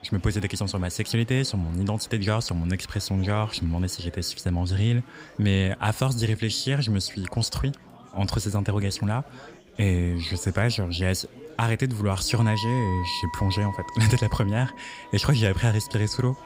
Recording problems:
background music; noticeable; throughout; 10 dB below the speech
chatter from many people; faint; throughout; 25 dB below the speech

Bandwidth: 15.5 kHz